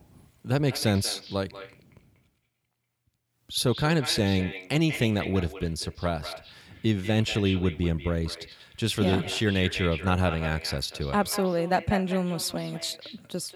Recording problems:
echo of what is said; noticeable; throughout; 190 ms later, 10 dB below the speech

